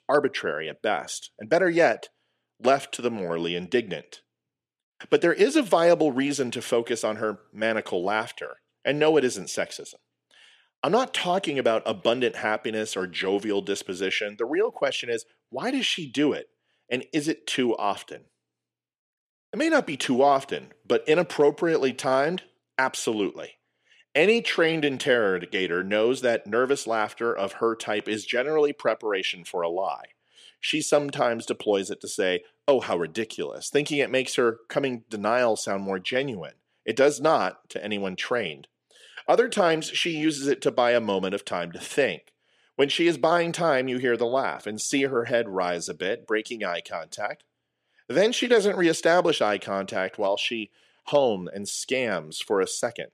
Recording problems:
thin; somewhat; fading below 350 Hz

